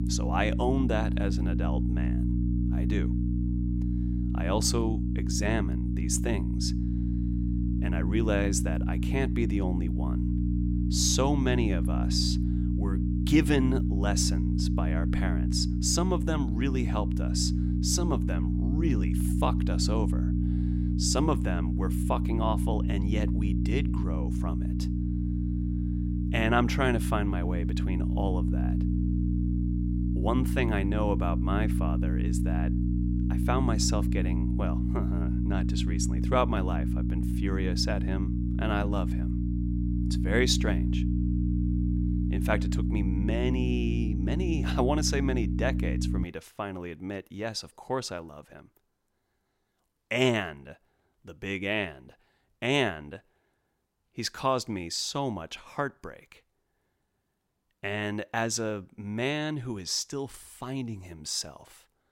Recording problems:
electrical hum; loud; until 46 s; 60 Hz, 6 dB below the speech

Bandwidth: 16 kHz